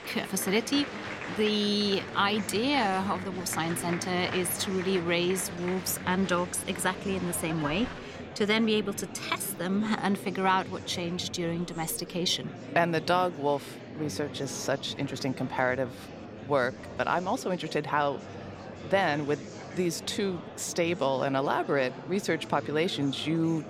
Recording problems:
murmuring crowd; noticeable; throughout; 10 dB below the speech

